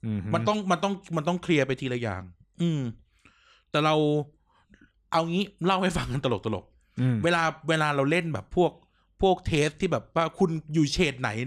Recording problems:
abrupt cut into speech; at the end

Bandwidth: 14.5 kHz